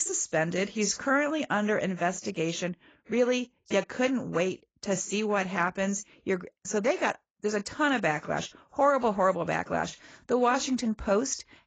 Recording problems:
garbled, watery; badly; nothing above 7.5 kHz
abrupt cut into speech; at the start

